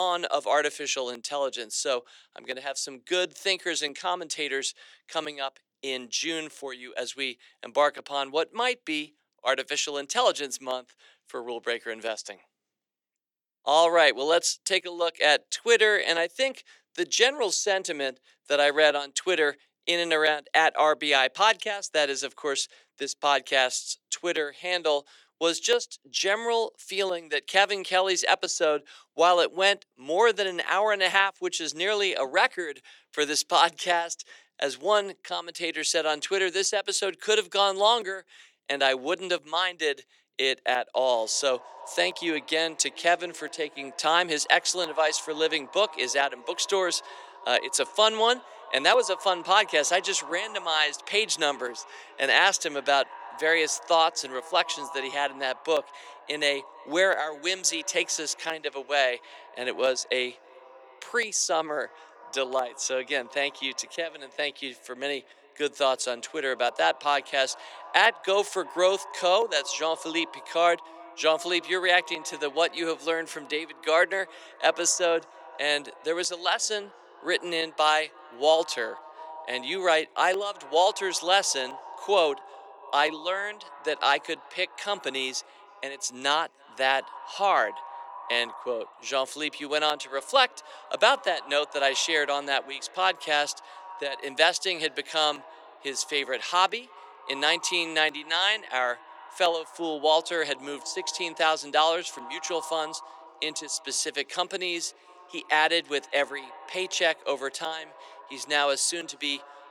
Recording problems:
thin; very; fading below 450 Hz
echo of what is said; faint; from 41 s on; 330 ms later, 20 dB below the speech
abrupt cut into speech; at the start

